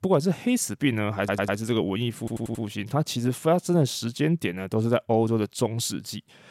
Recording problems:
audio stuttering; at 1 s and at 2 s

